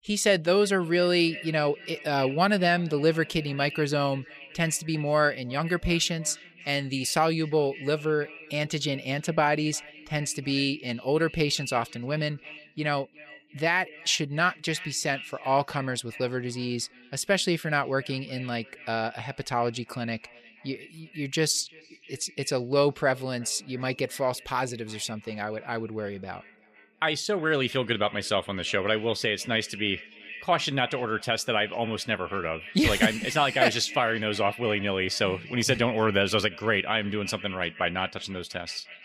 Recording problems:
echo of what is said; noticeable; throughout; 350 ms later, 15 dB below the speech

